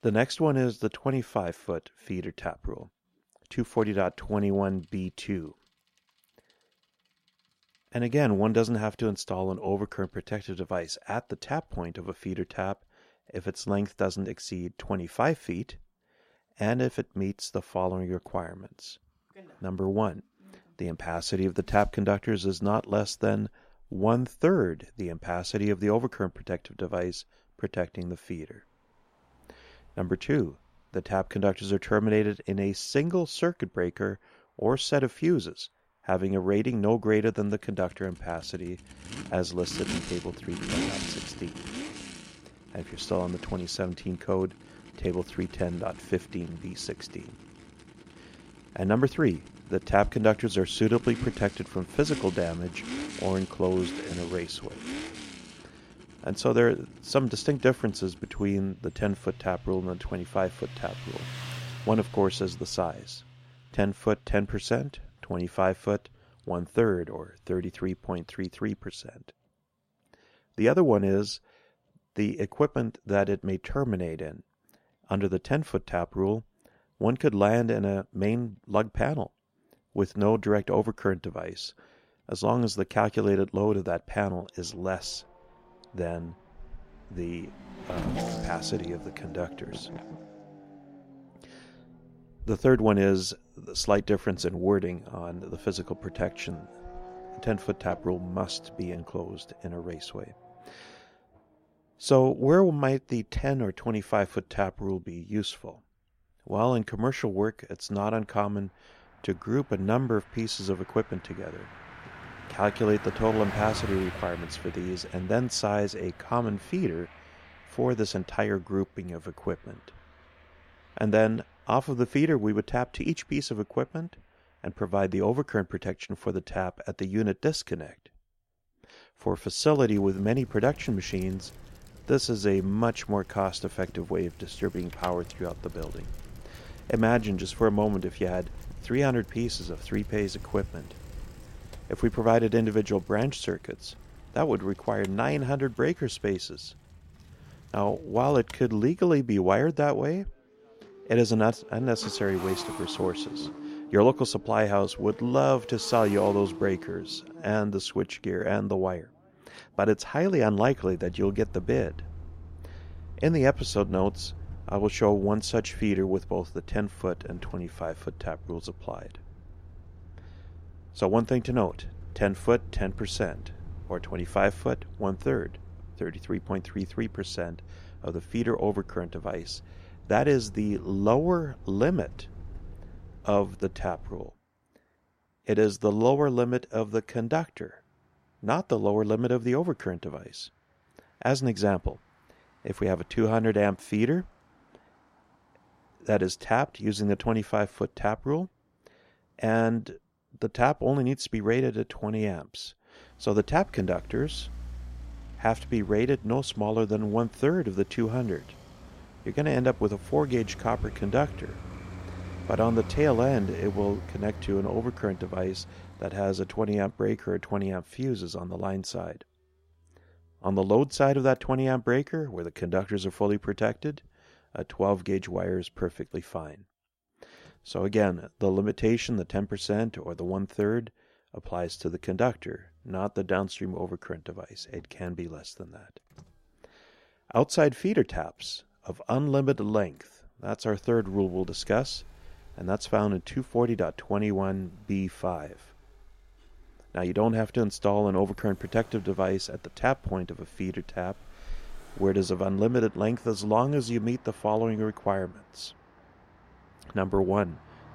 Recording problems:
traffic noise; noticeable; throughout; 15 dB below the speech

